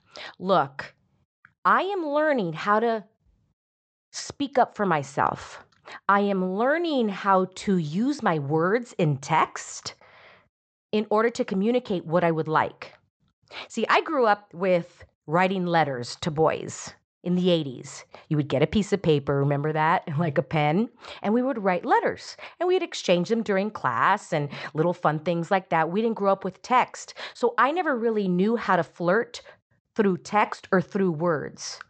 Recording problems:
high frequencies cut off; noticeable; nothing above 8 kHz

